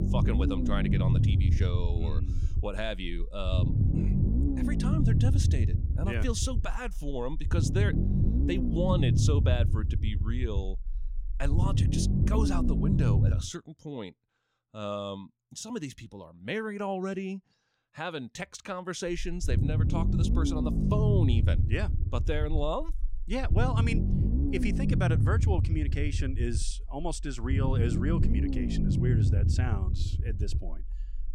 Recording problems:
low rumble; loud; until 13 s and from 19 s on; 3 dB below the speech

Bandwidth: 16 kHz